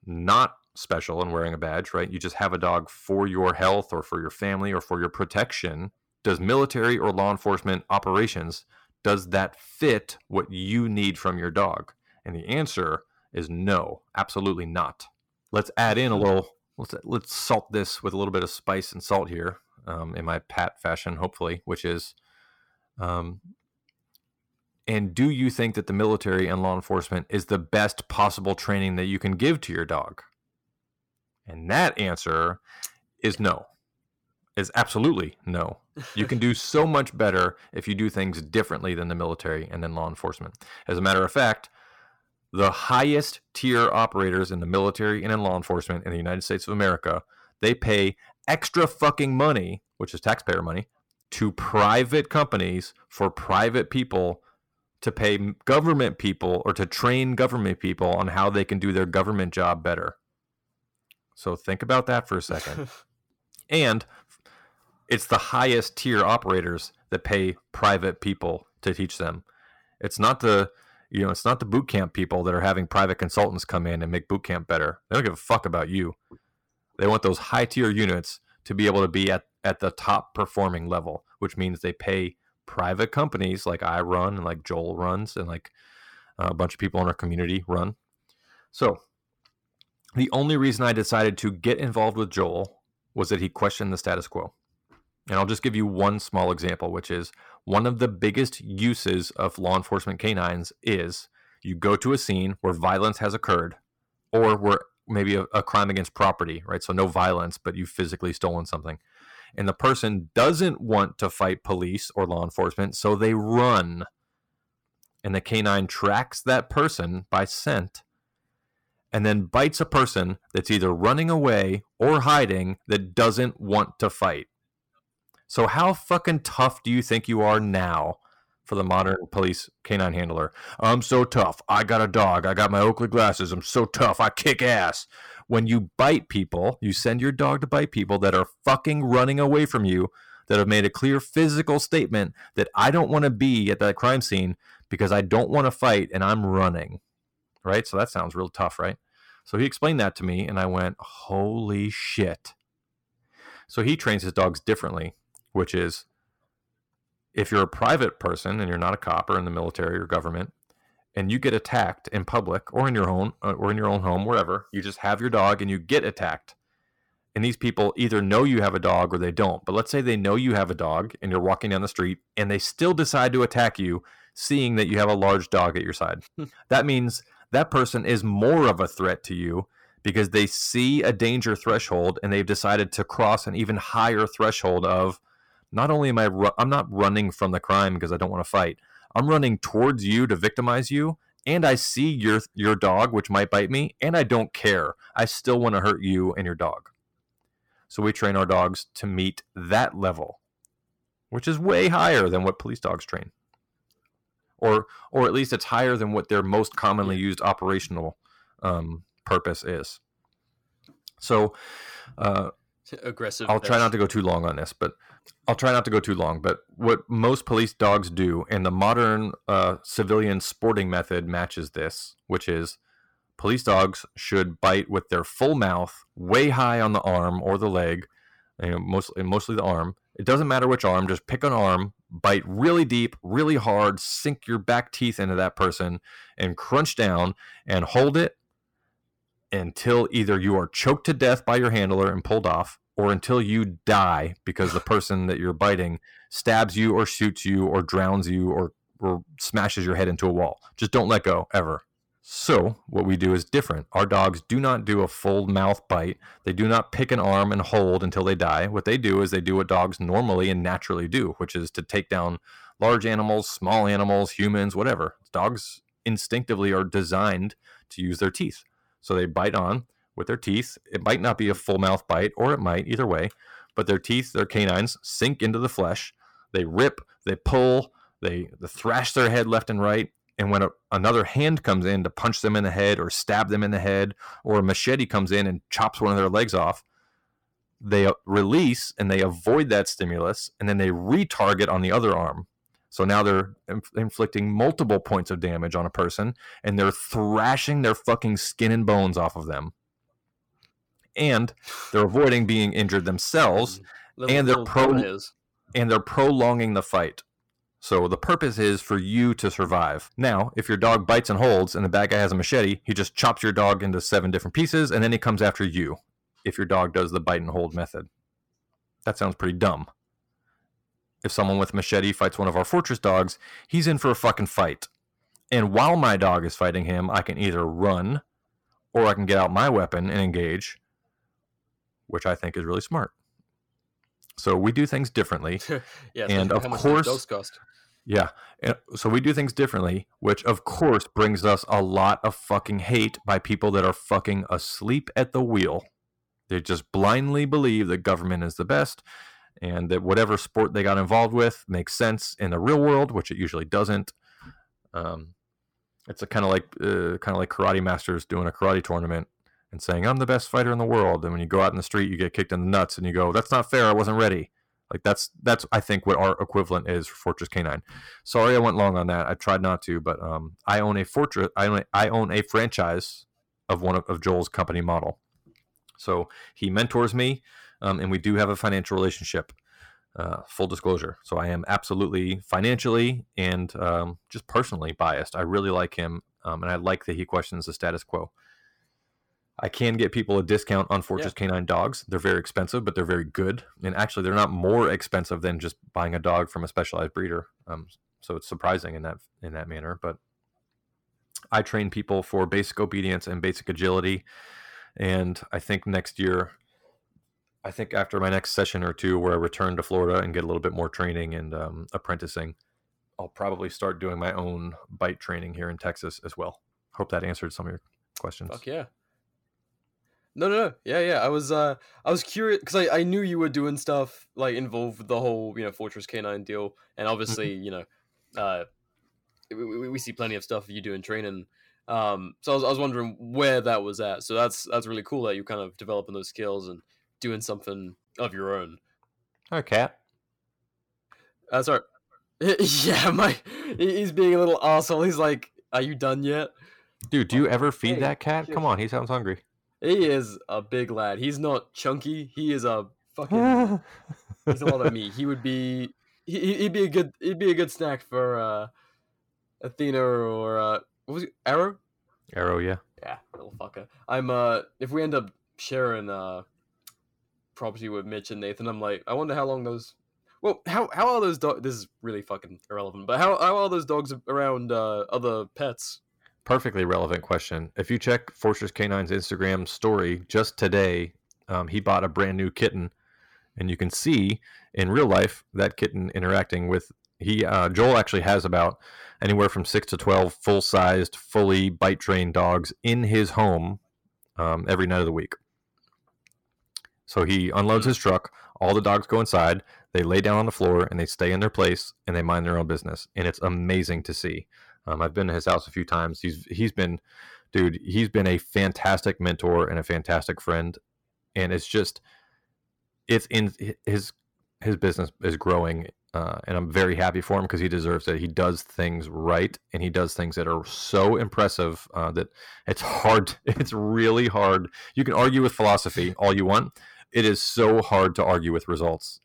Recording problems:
distortion; slight; 10 dB below the speech

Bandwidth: 17.5 kHz